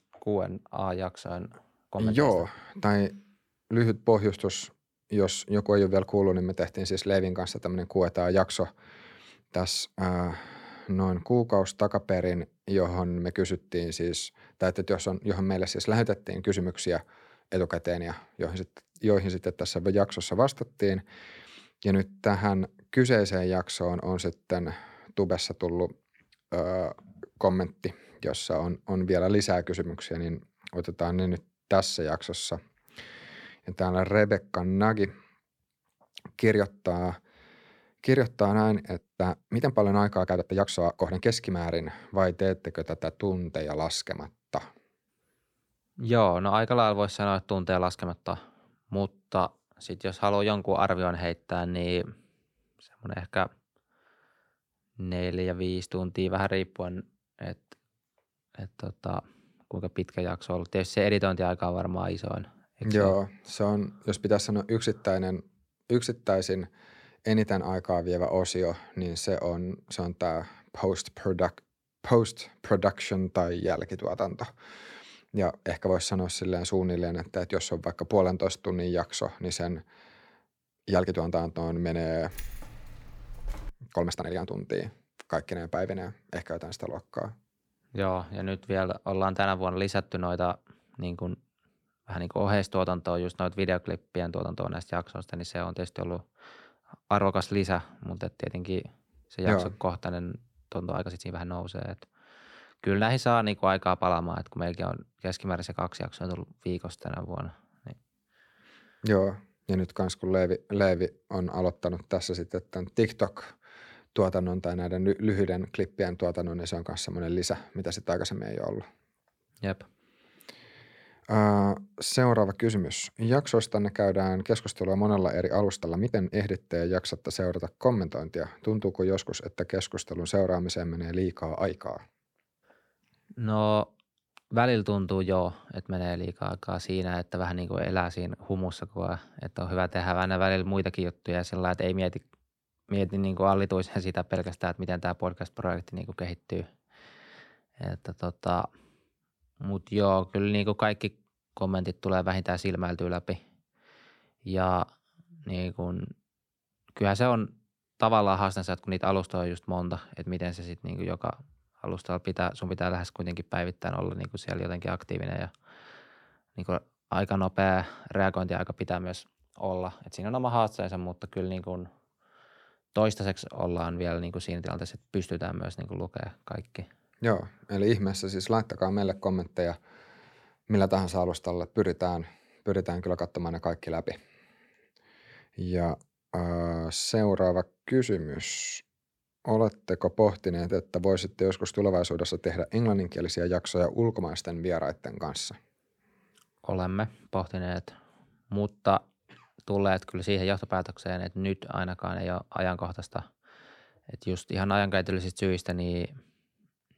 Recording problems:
uneven, jittery; strongly; from 2 s to 3:11
jangling keys; faint; from 1:22 to 1:24; peak 15 dB below the speech

